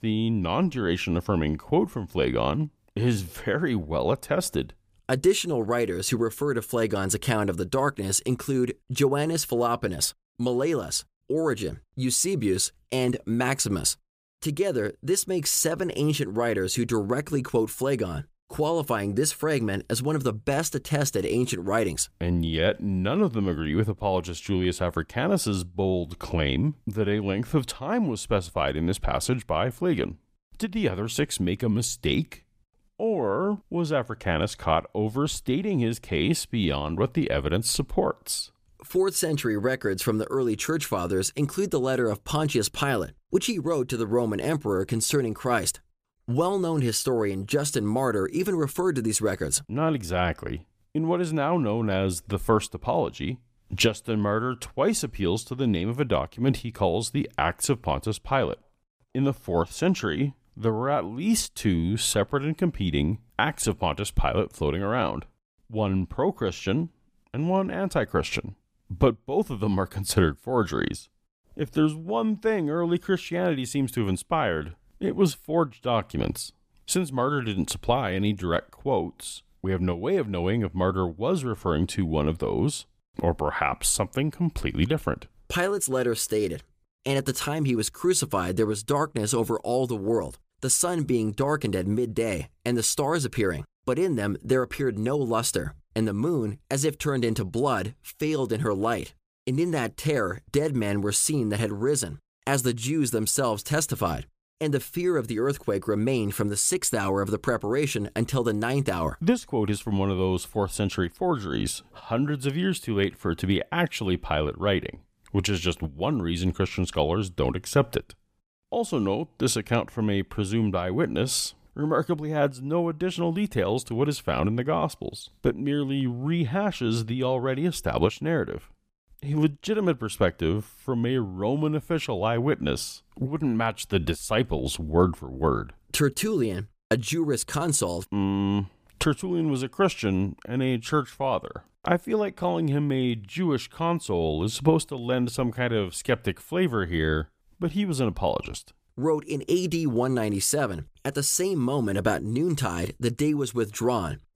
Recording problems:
none

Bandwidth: 15 kHz